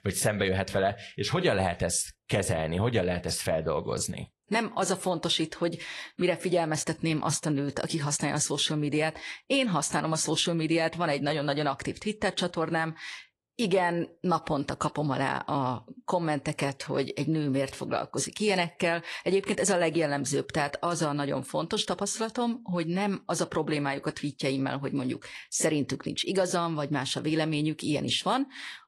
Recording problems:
garbled, watery; slightly; nothing above 11.5 kHz

